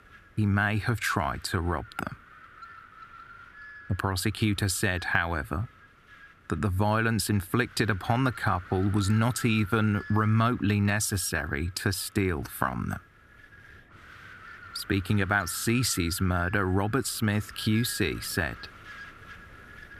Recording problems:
wind noise on the microphone; occasional gusts; 15 dB below the speech

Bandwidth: 14.5 kHz